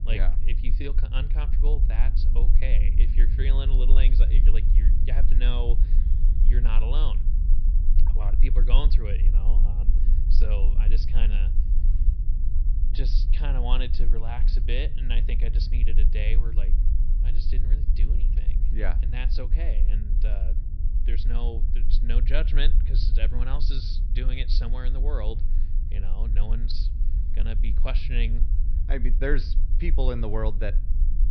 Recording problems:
high frequencies cut off; noticeable; nothing above 5.5 kHz
low rumble; loud; throughout; 10 dB below the speech

